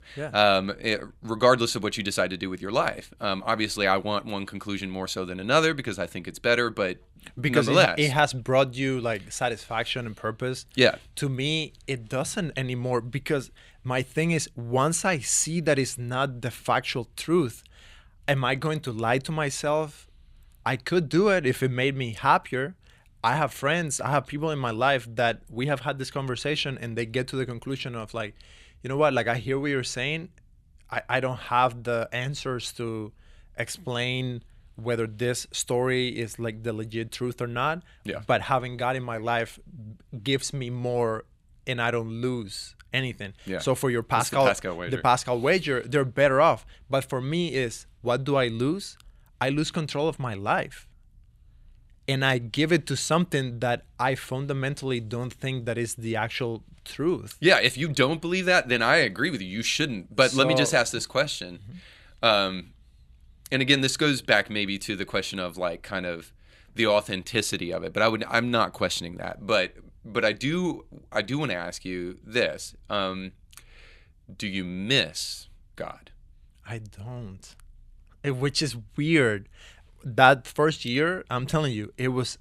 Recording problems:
none

